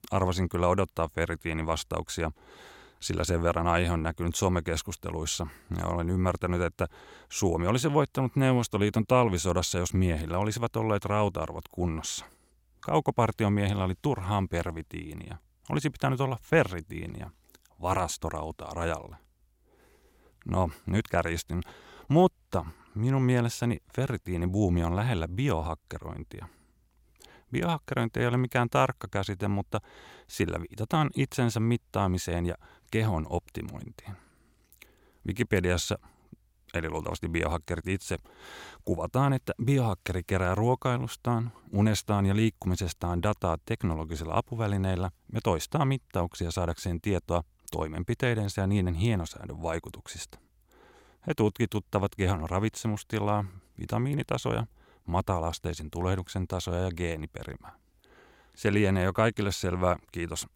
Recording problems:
none

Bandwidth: 16.5 kHz